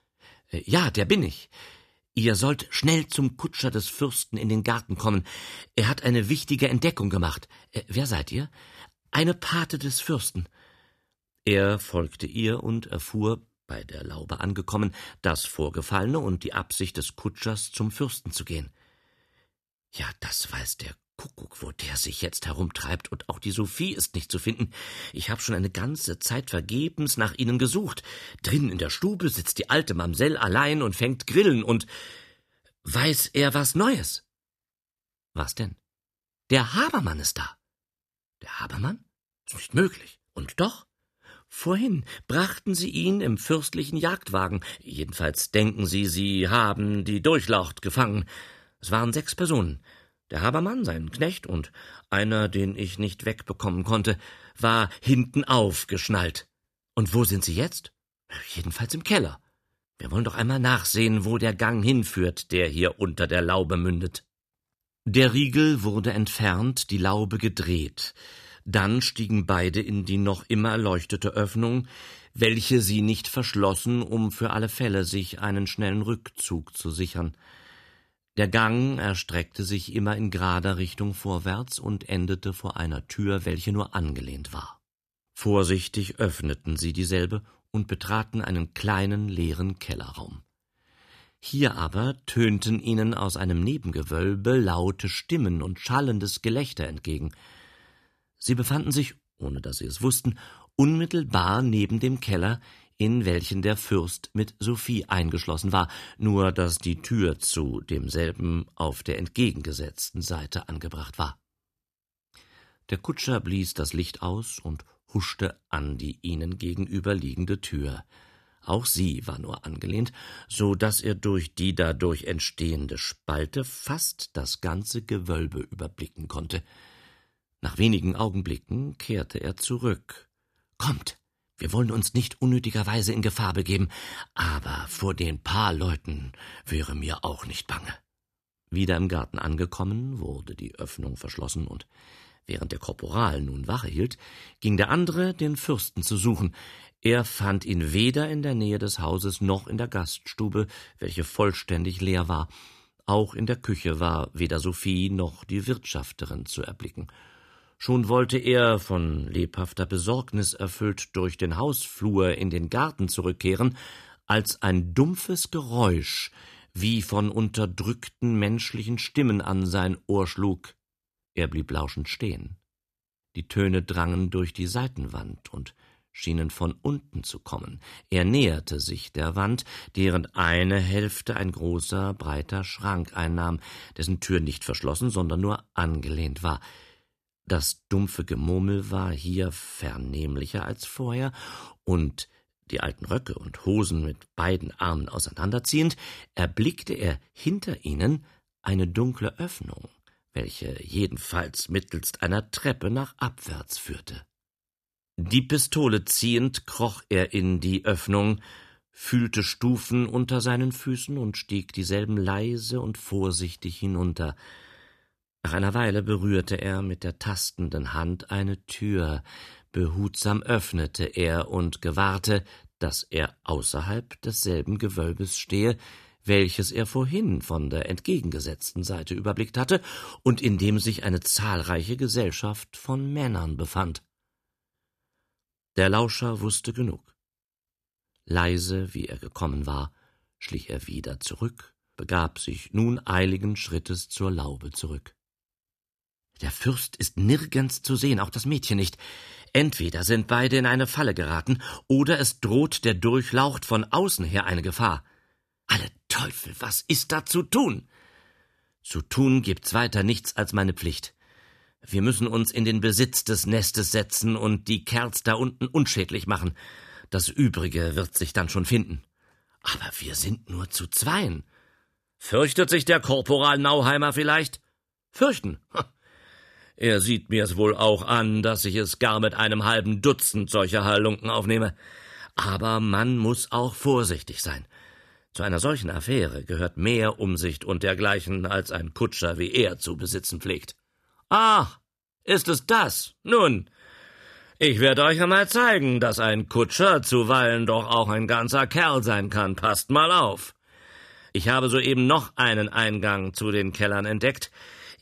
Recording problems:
none

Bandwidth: 14 kHz